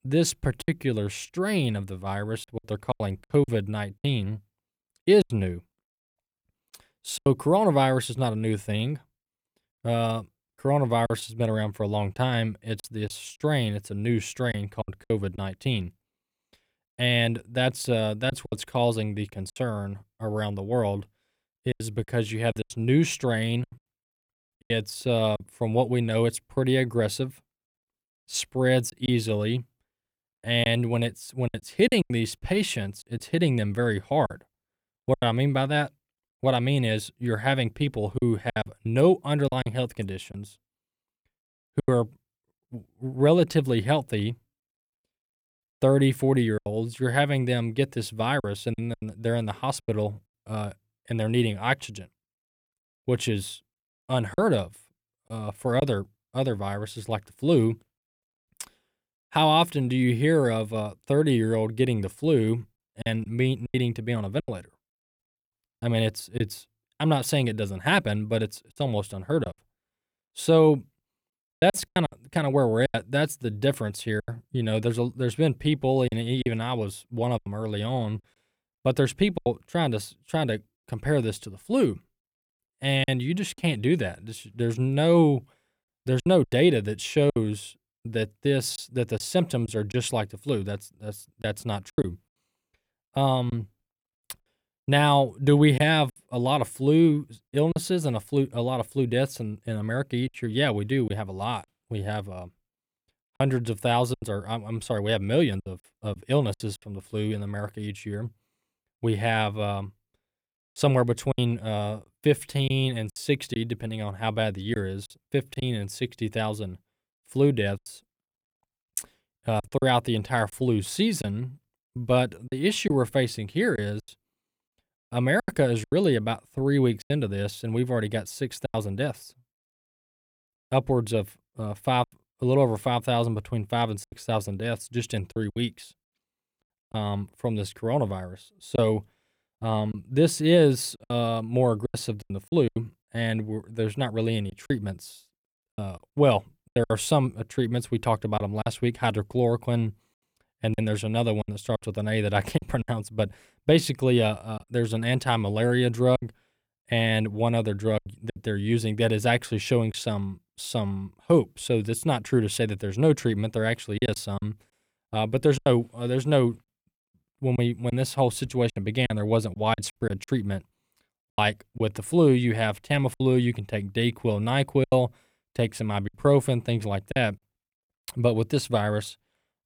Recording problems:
choppy; very; 6% of the speech affected

